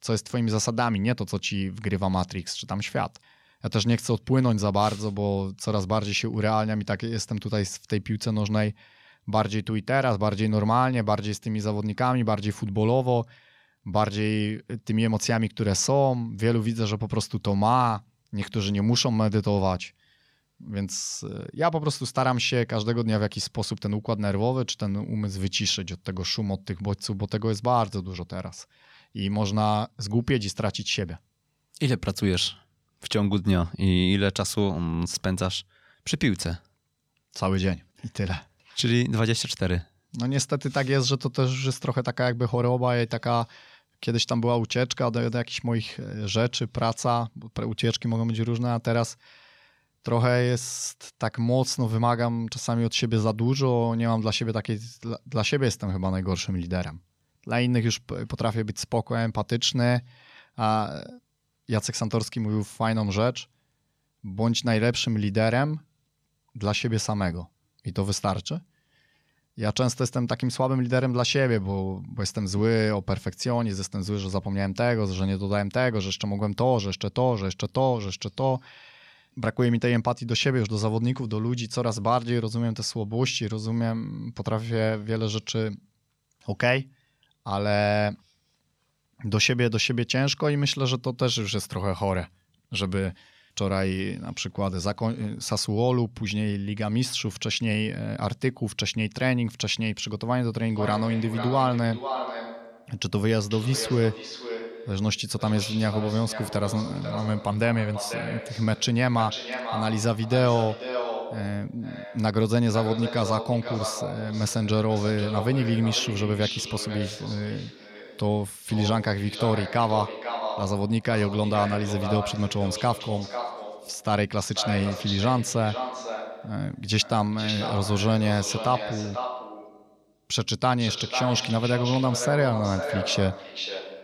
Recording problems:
echo of what is said; strong; from 1:41 on; 490 ms later, 8 dB below the speech

